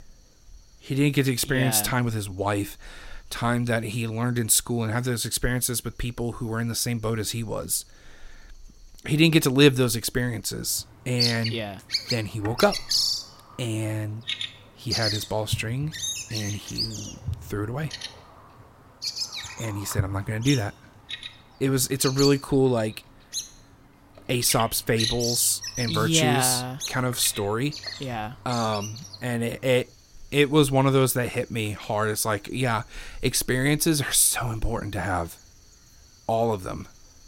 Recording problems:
animal sounds; loud; throughout; 6 dB below the speech

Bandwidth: 16 kHz